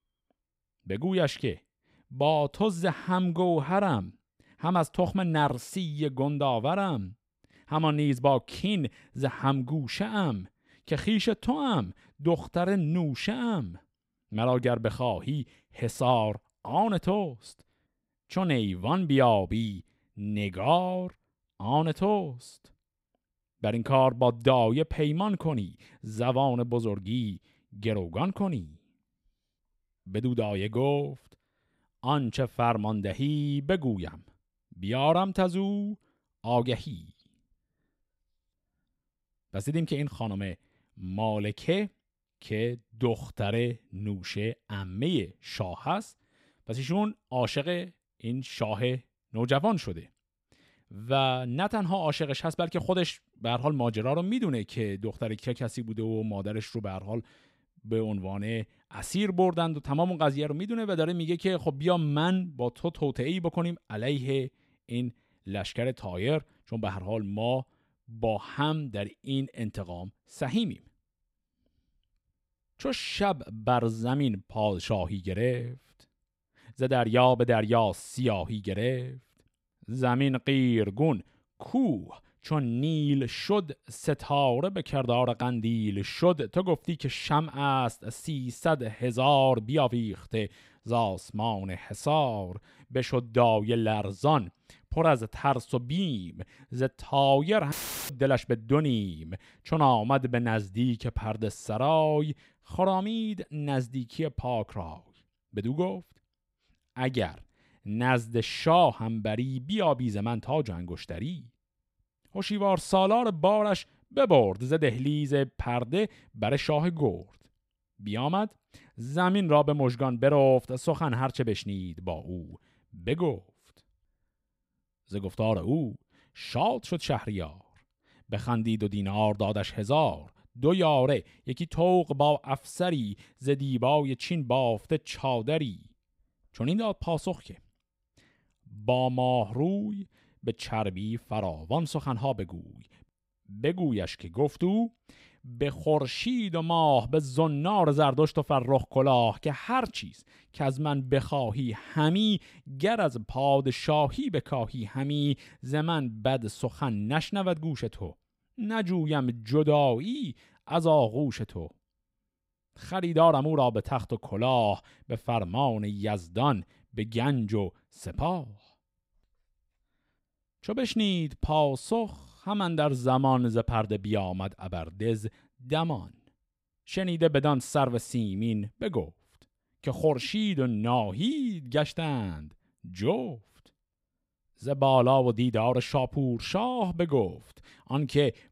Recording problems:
audio cutting out; filled with static; at 1:38

